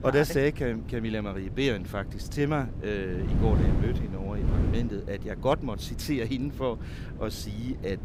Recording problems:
wind noise on the microphone; occasional gusts; 10 dB below the speech

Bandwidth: 15.5 kHz